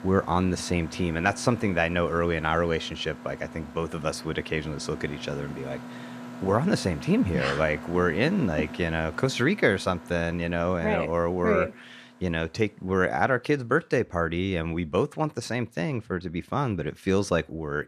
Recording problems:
machinery noise; noticeable; throughout; 15 dB below the speech

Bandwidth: 14.5 kHz